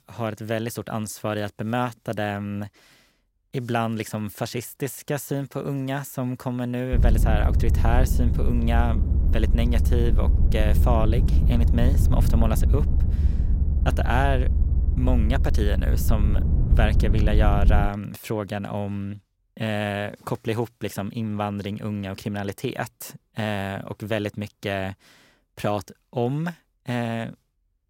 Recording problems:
low rumble; loud; from 7 to 18 s; 8 dB below the speech

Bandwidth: 16 kHz